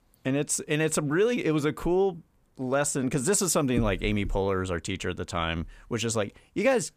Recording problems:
none

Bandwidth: 15 kHz